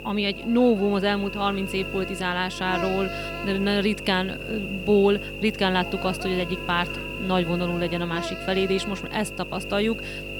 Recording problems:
electrical hum; loud; throughout; 50 Hz, 6 dB below the speech

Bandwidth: 18.5 kHz